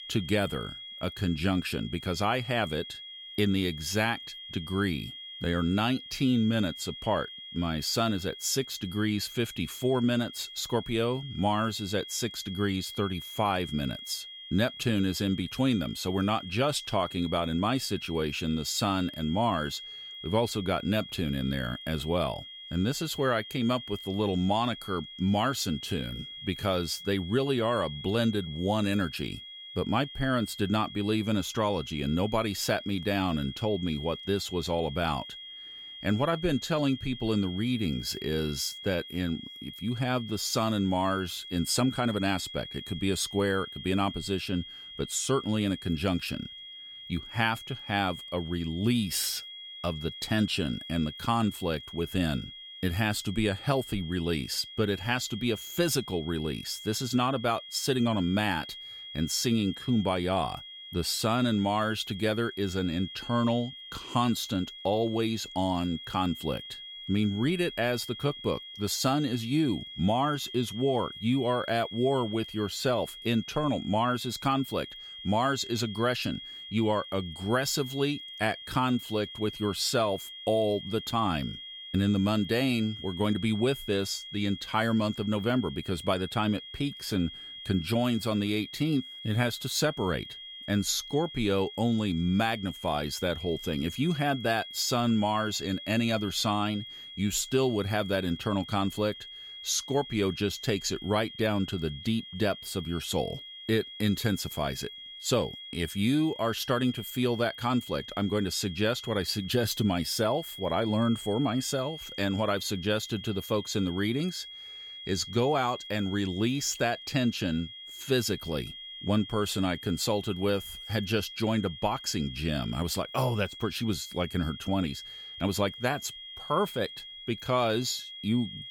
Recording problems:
high-pitched whine; noticeable; throughout; 3.5 kHz, 10 dB below the speech

